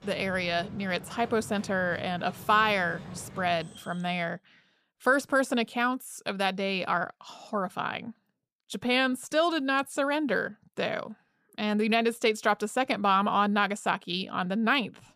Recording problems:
animal sounds; noticeable; until 4 s; 15 dB below the speech

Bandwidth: 14.5 kHz